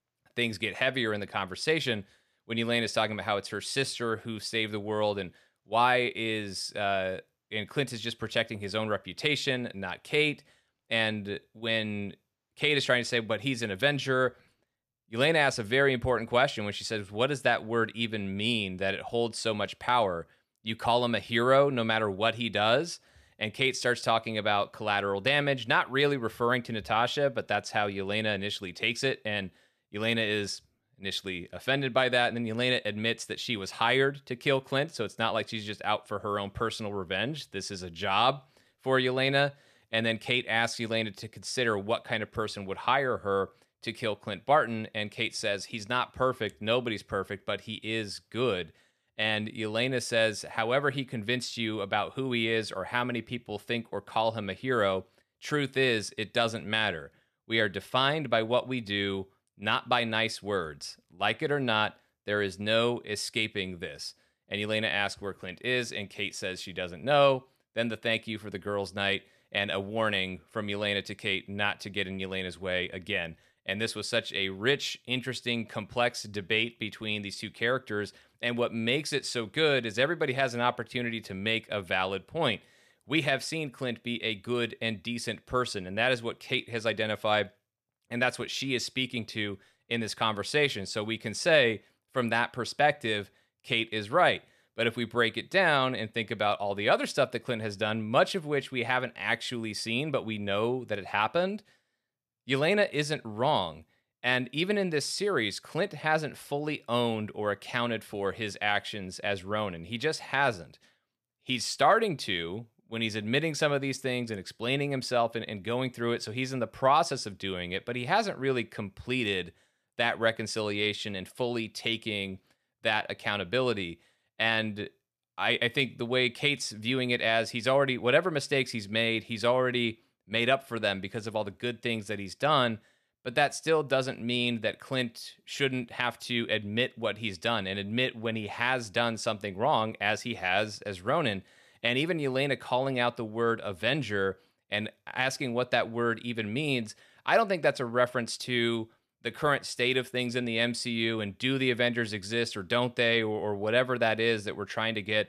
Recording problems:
none

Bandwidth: 14.5 kHz